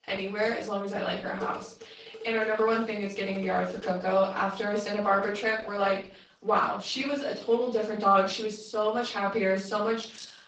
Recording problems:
off-mic speech; far
room echo; slight; dies away in 0.5 s
garbled, watery; slightly
thin; very slightly; fading below 950 Hz
clattering dishes; faint; from 1.5 to 4 s; peak 10 dB below the speech
jangling keys; faint; at 10 s; peak 20 dB below the speech

